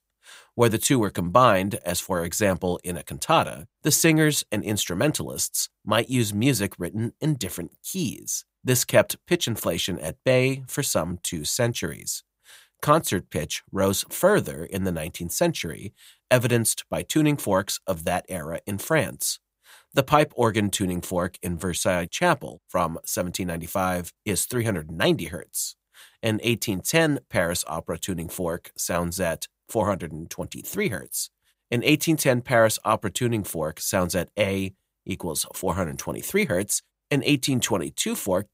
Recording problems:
none

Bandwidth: 15.5 kHz